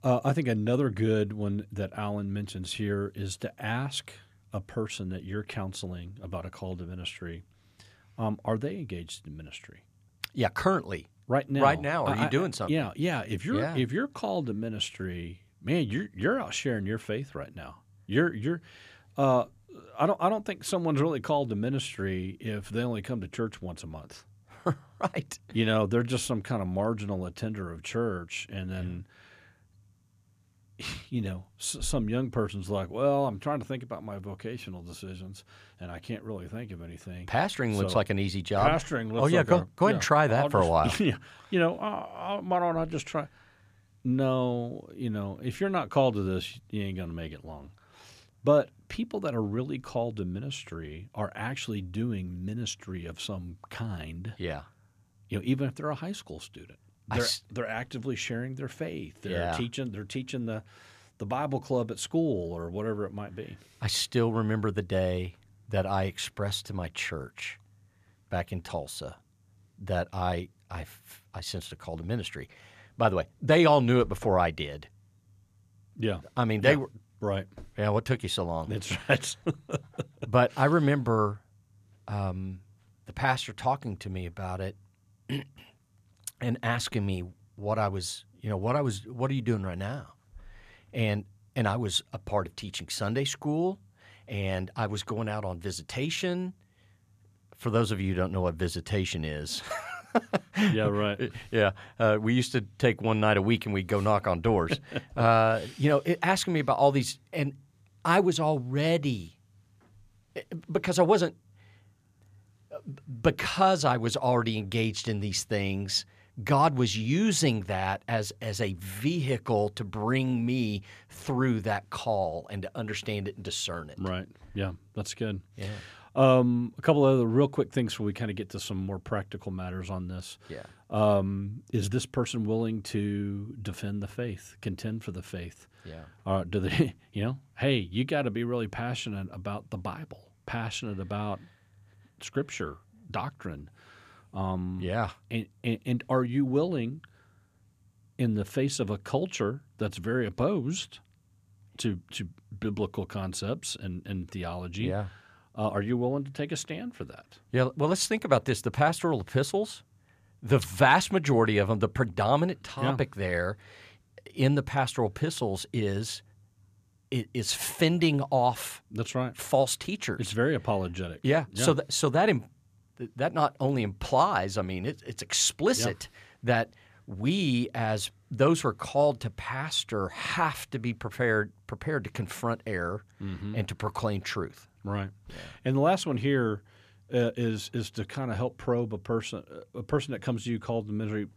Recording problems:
none

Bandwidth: 14.5 kHz